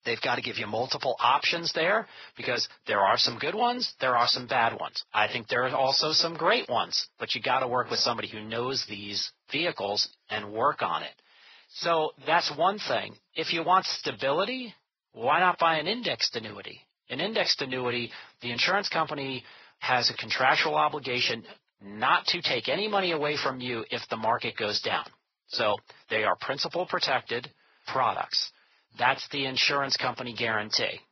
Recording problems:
garbled, watery; badly; nothing above 5.5 kHz
thin; very; fading below 700 Hz

